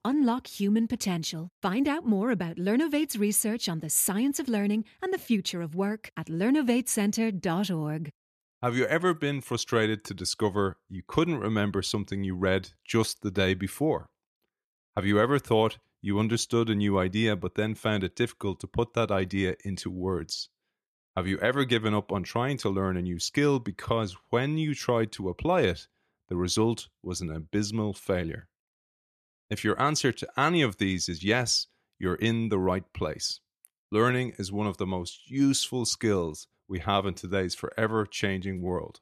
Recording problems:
none

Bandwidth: 14 kHz